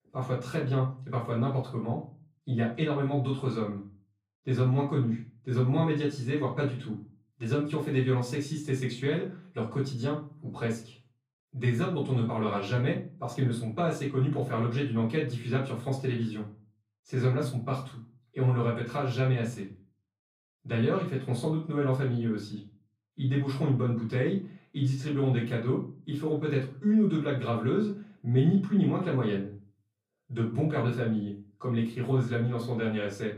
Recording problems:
off-mic speech; far
room echo; slight; dies away in 0.3 s

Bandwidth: 14.5 kHz